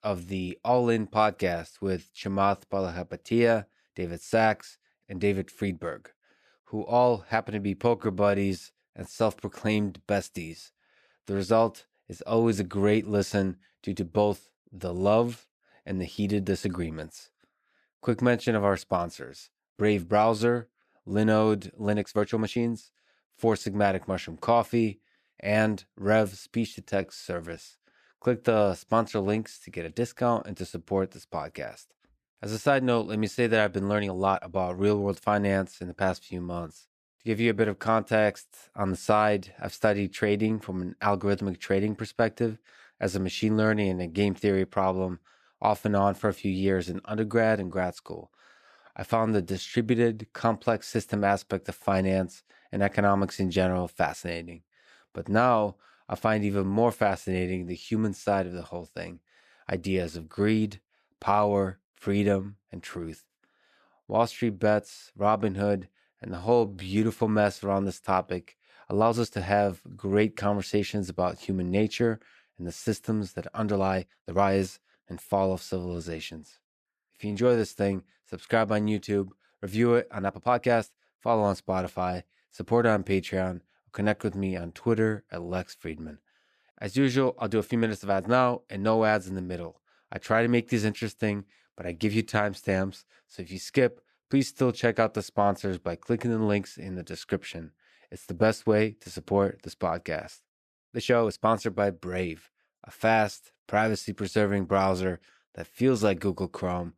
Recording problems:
uneven, jittery; strongly; from 8 s to 1:41

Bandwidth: 14.5 kHz